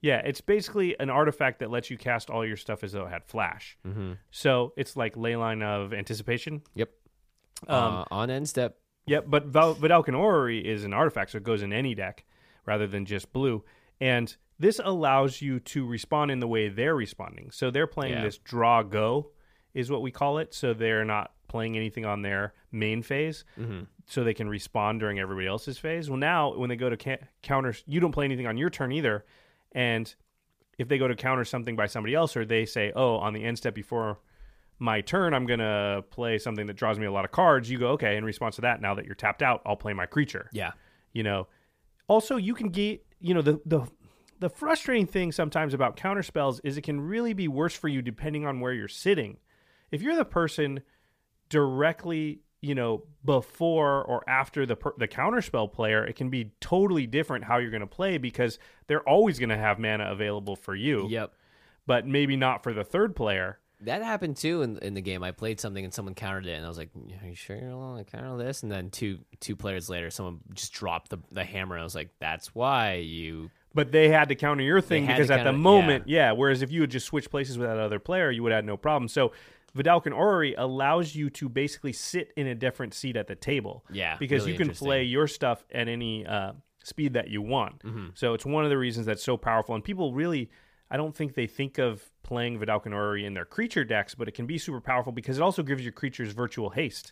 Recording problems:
none

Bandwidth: 15 kHz